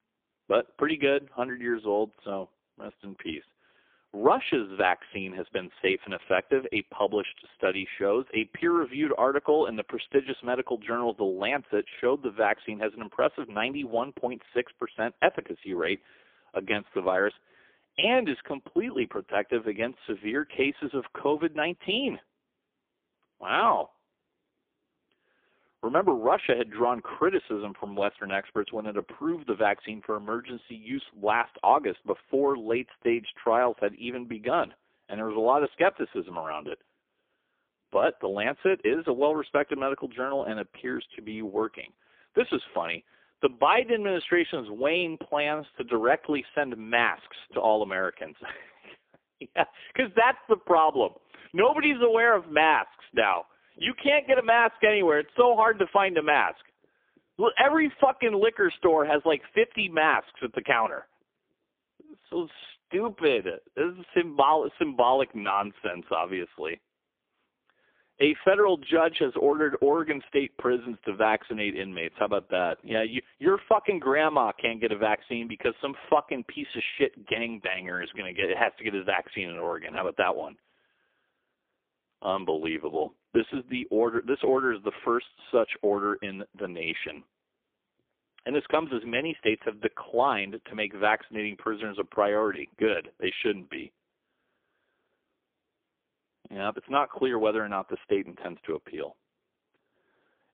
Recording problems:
phone-call audio; poor line; nothing above 3.5 kHz

